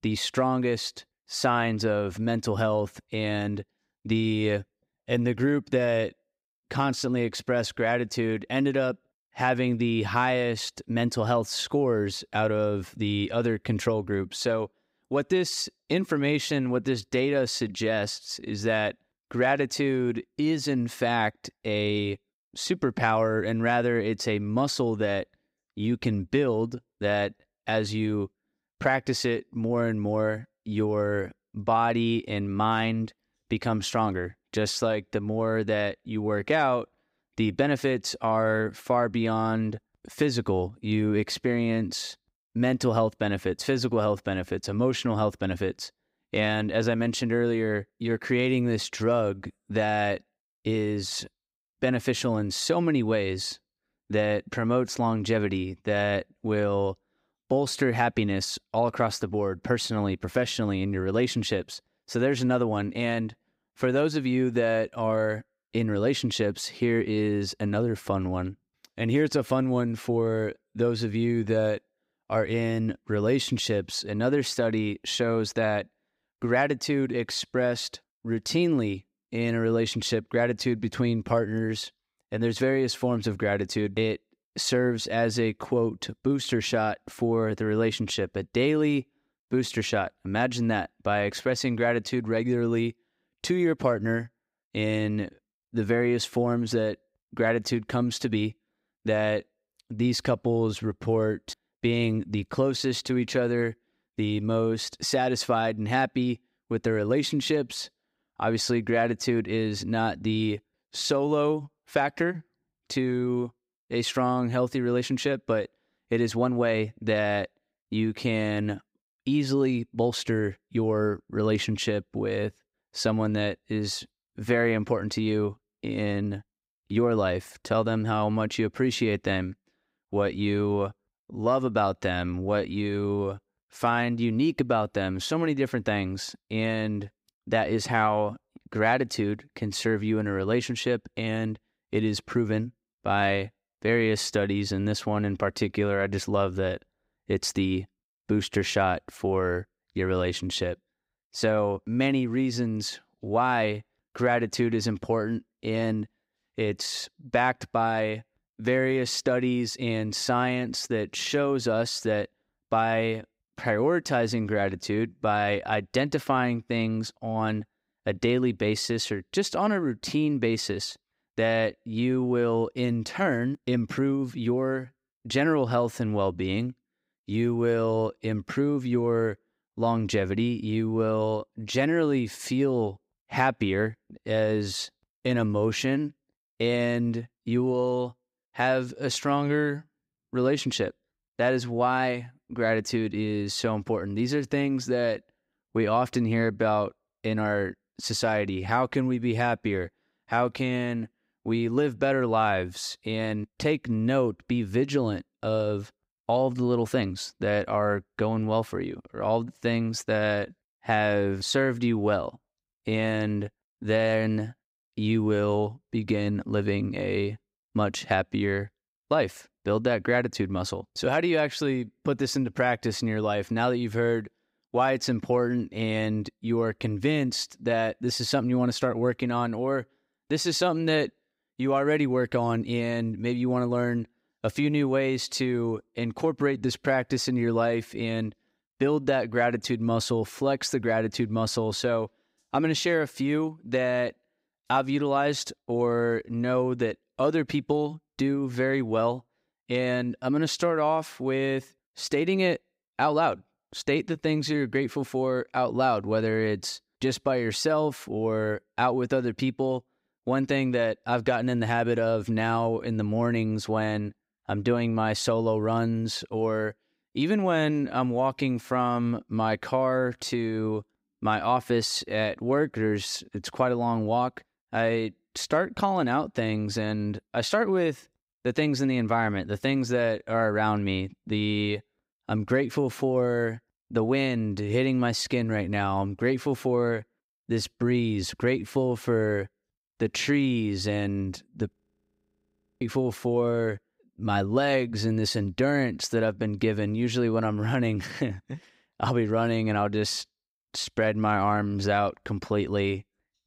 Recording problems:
audio freezing; at 4:52 for 1 s

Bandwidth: 15.5 kHz